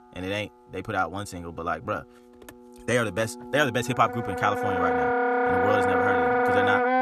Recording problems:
wrong speed, natural pitch; too fast; 1.5 times normal speed
background music; very loud; throughout; 4 dB above the speech

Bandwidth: 13.5 kHz